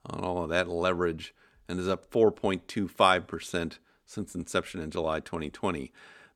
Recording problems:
none

